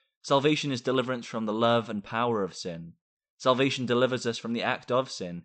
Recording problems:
high frequencies cut off; noticeable; nothing above 8 kHz

